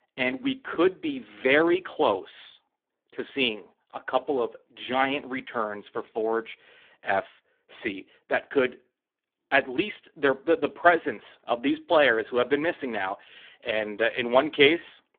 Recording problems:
phone-call audio; poor line; nothing above 3.5 kHz

